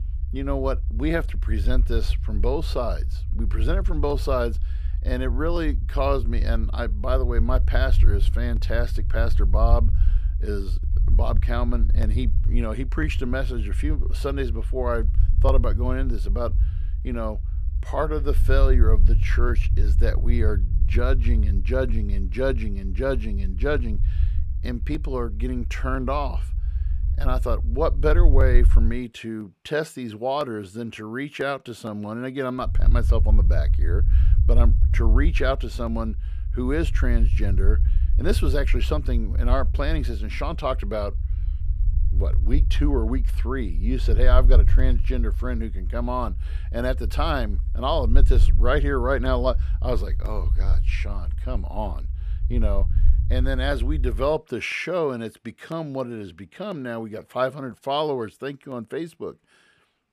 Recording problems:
low rumble; noticeable; until 29 s and from 33 to 54 s; 15 dB below the speech

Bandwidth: 14.5 kHz